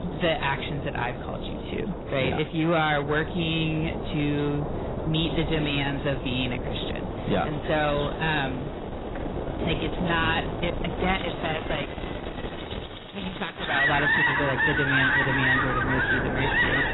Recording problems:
distortion; heavy; 9 dB below the speech
garbled, watery; badly; nothing above 4 kHz
animal sounds; very loud; throughout; 1 dB above the speech
wind noise on the microphone; heavy; 7 dB below the speech
rain or running water; faint; throughout; 20 dB below the speech

